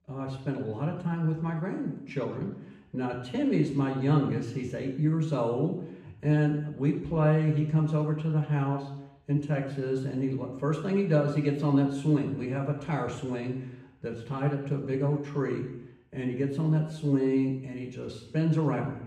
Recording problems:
off-mic speech; far
room echo; noticeable; dies away in 0.7 s

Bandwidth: 14.5 kHz